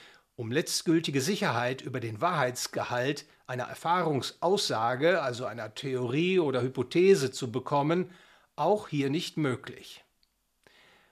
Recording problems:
uneven, jittery; strongly; from 1 to 10 s

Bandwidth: 14.5 kHz